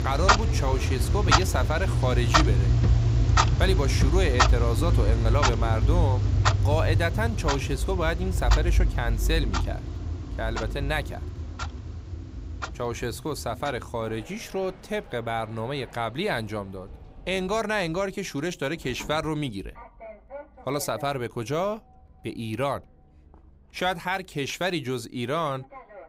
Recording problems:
household noises; very loud; throughout; 5 dB above the speech

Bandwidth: 15.5 kHz